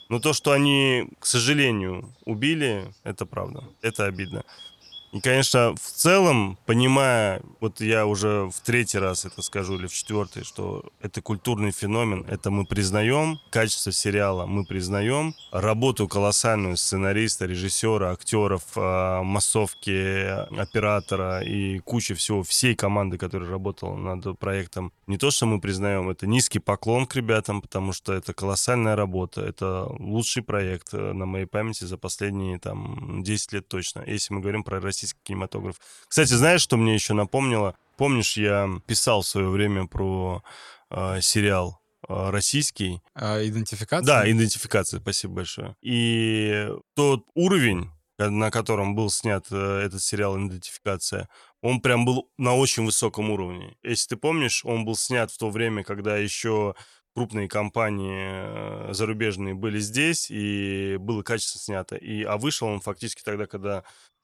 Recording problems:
animal sounds; faint; throughout; 25 dB below the speech

